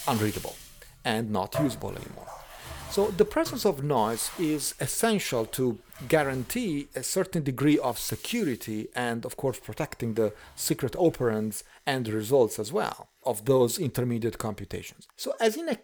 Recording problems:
household noises; noticeable; throughout; 15 dB below the speech

